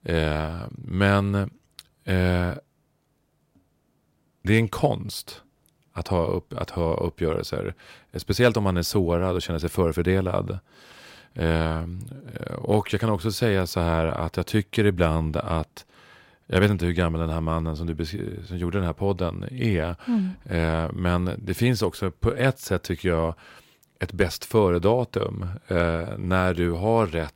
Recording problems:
none

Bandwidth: 16 kHz